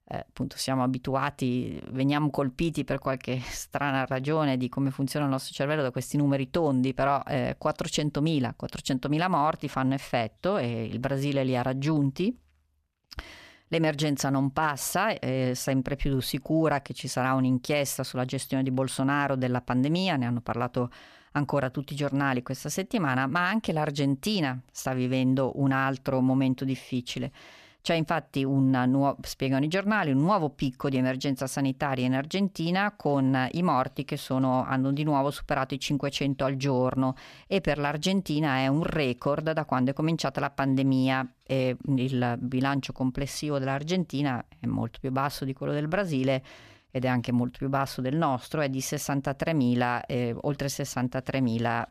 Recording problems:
none

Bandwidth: 14.5 kHz